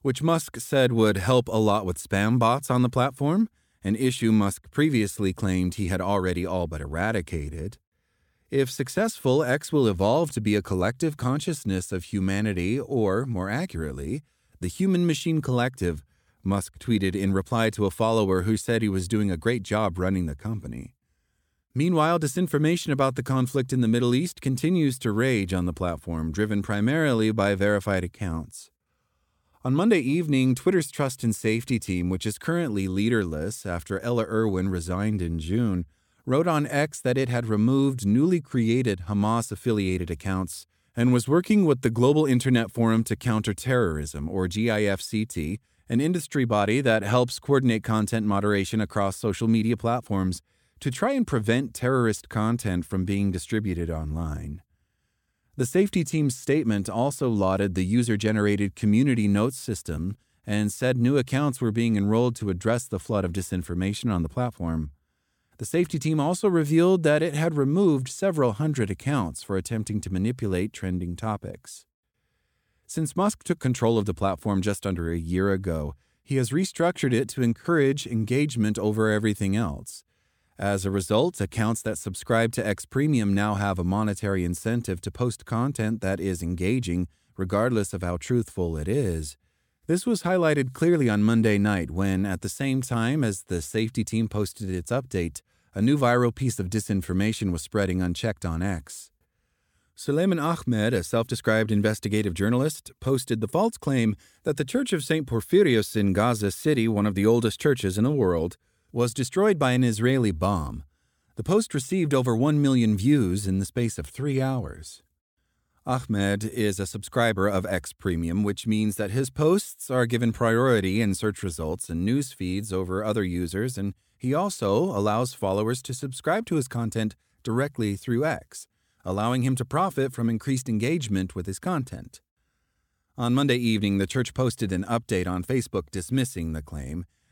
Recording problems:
none

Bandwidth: 17 kHz